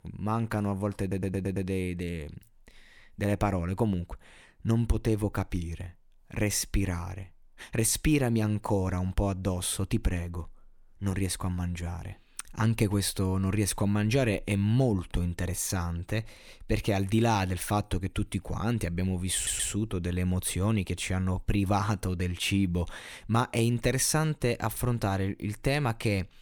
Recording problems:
audio stuttering; at 1 s and at 19 s

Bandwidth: 18.5 kHz